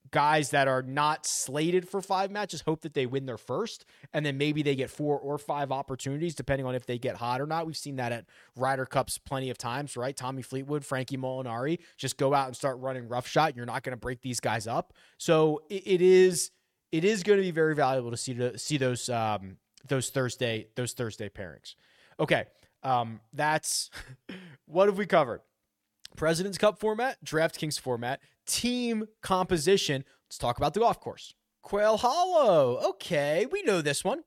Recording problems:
none

